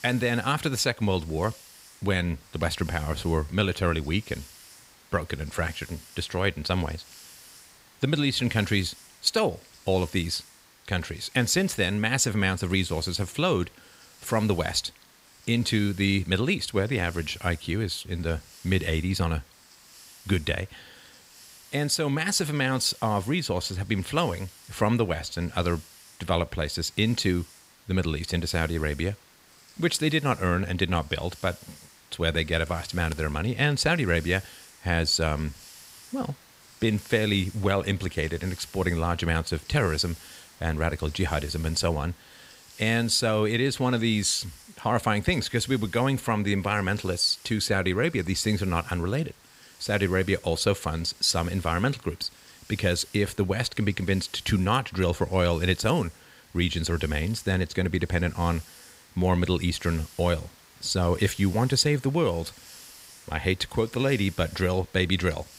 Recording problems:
hiss; faint; throughout; 20 dB below the speech

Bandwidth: 15.5 kHz